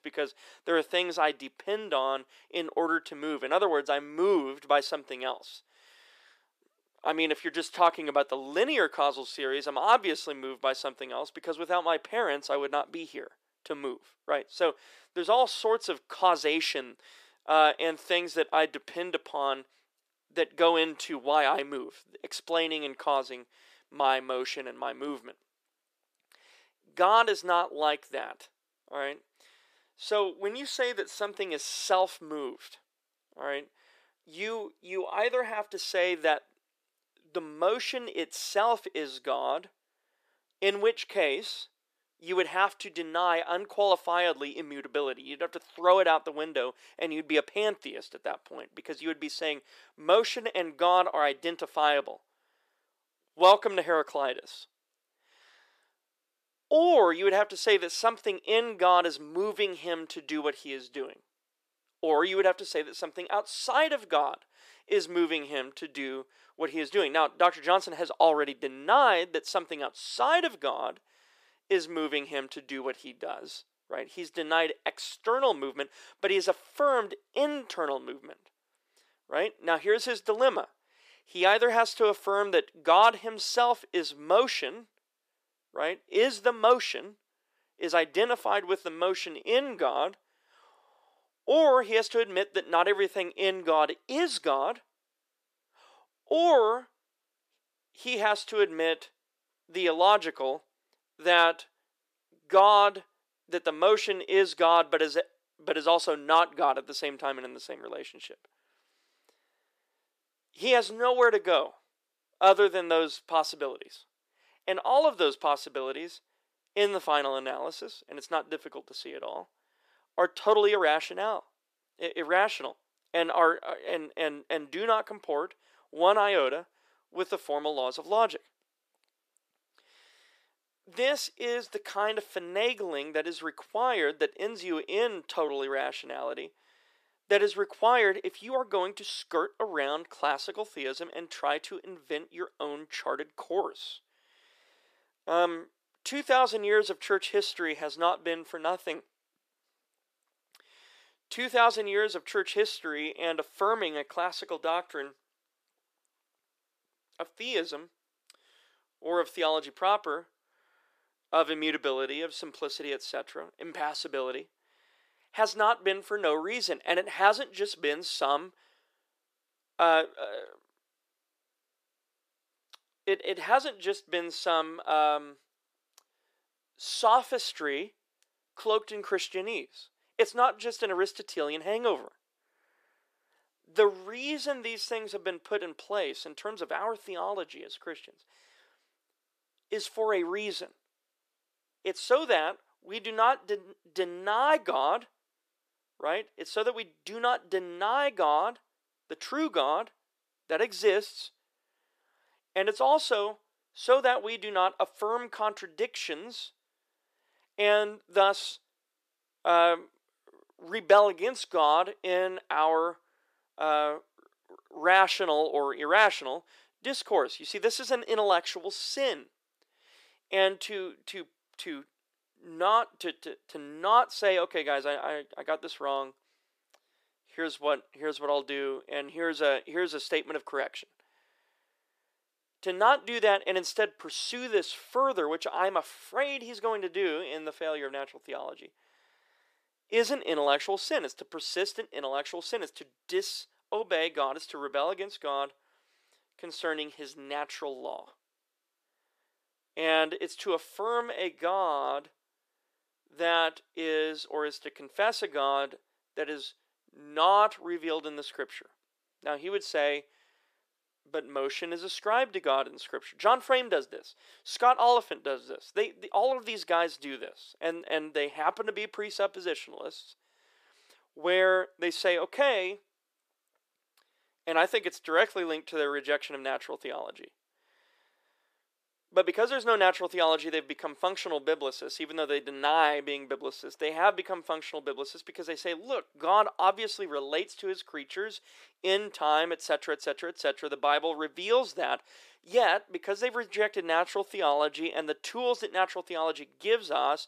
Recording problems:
thin; very; fading below 400 Hz

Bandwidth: 14.5 kHz